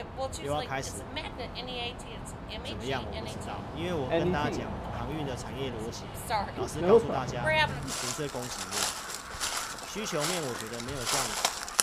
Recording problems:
animal sounds; very loud; throughout; 5 dB above the speech

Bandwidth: 14.5 kHz